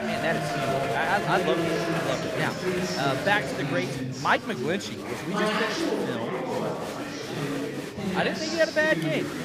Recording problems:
chatter from many people; loud; throughout; as loud as the speech

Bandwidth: 15 kHz